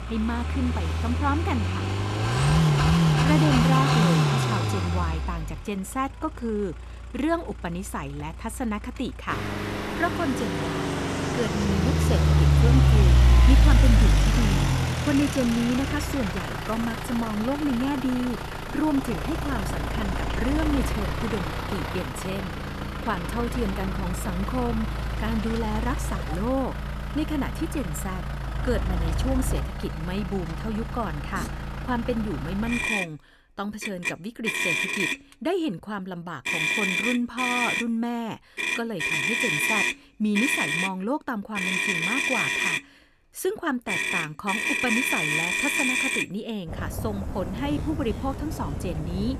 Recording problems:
traffic noise; very loud; throughout; 4 dB above the speech

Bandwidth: 14 kHz